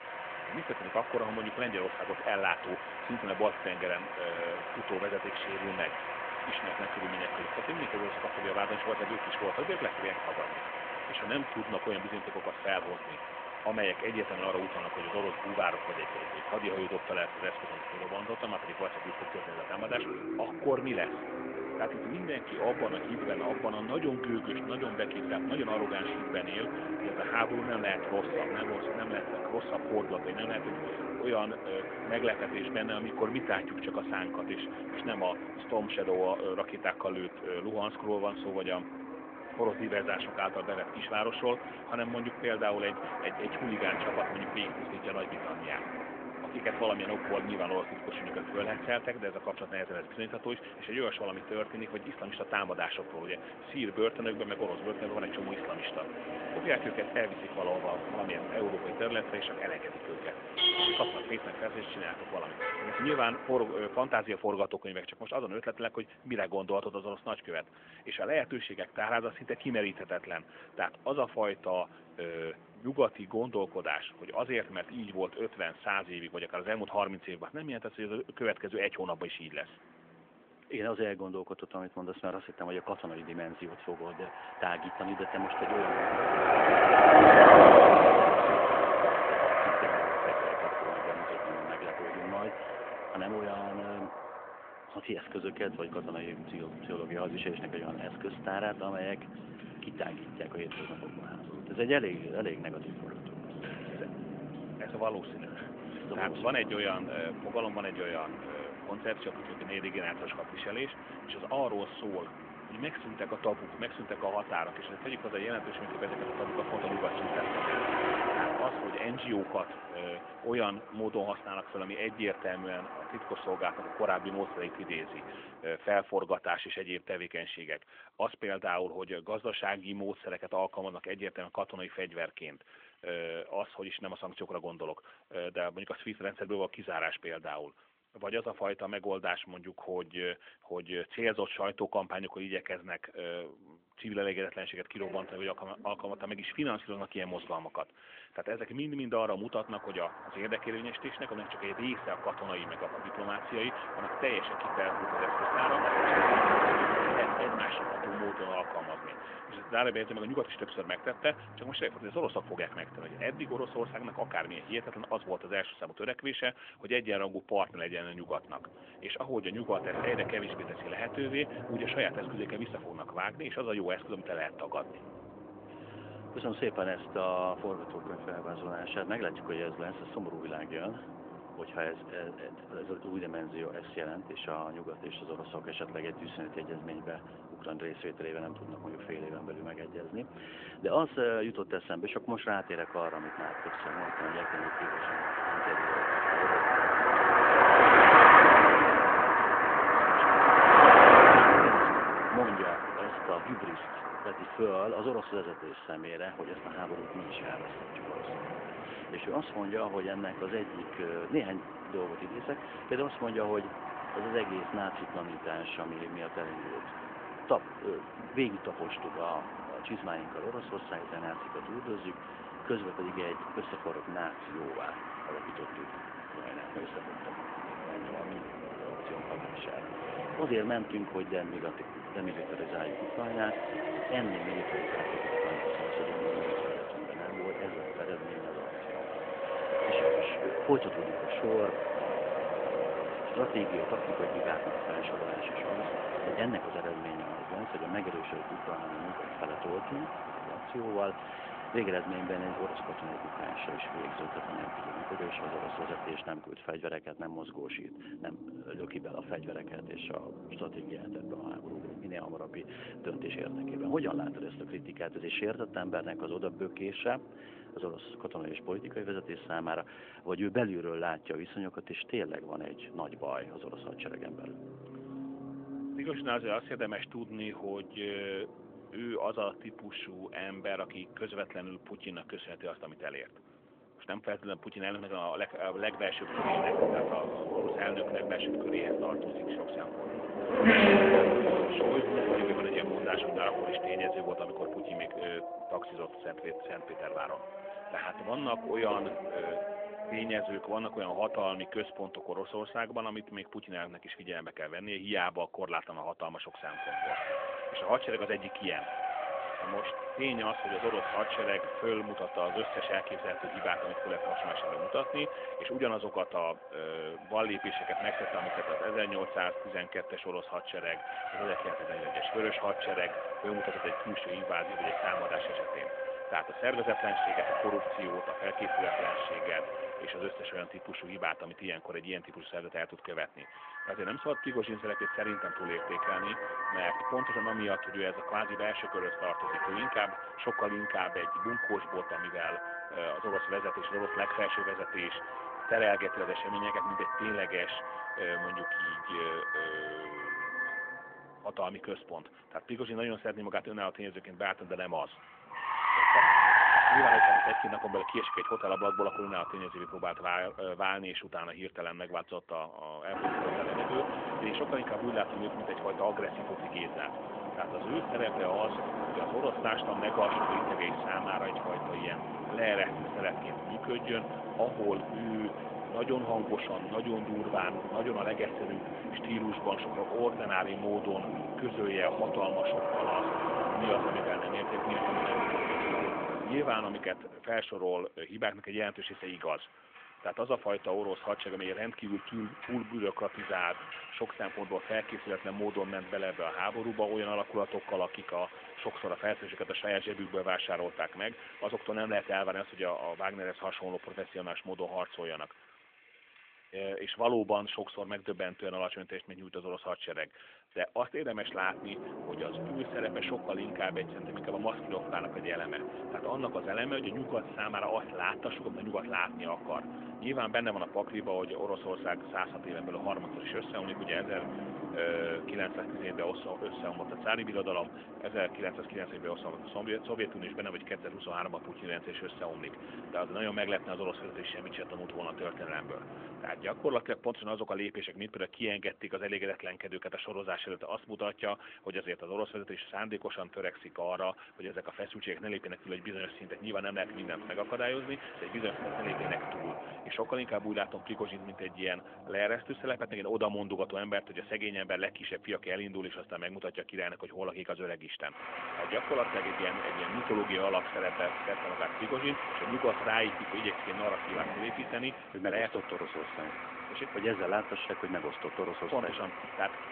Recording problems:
phone-call audio; nothing above 3.5 kHz
traffic noise; very loud; throughout; 5 dB above the speech

